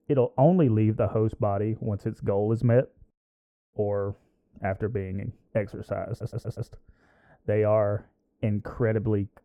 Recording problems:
muffled; very; fading above 2 kHz
audio stuttering; at 6 s

